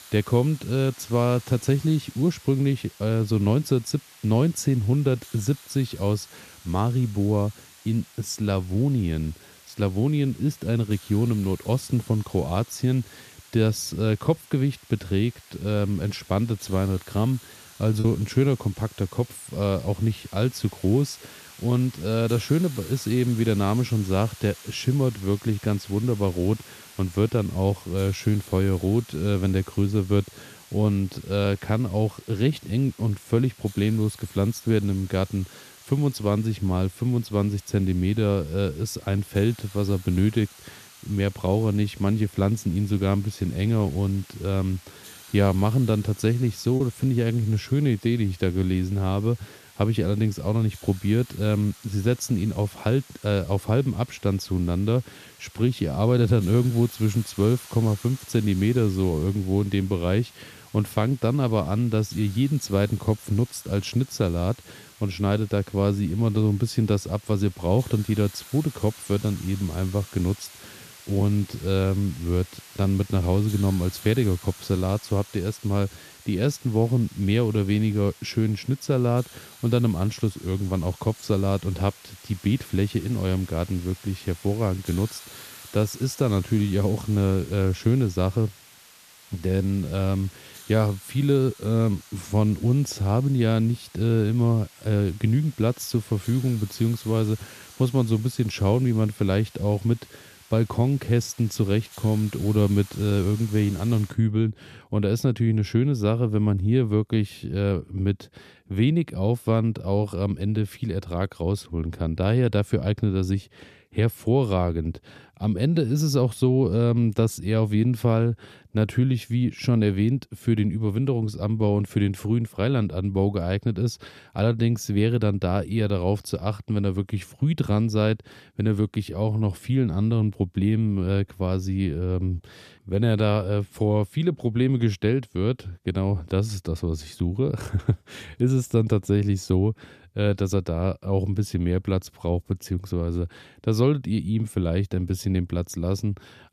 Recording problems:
hiss; faint; until 1:44; 20 dB below the speech
choppy; occasionally; at 18 s and at 47 s; 2% of the speech affected

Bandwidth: 14.5 kHz